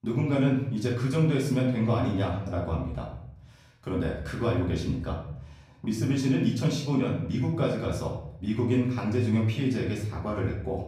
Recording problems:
off-mic speech; far
room echo; noticeable; dies away in 0.7 s

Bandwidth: 15 kHz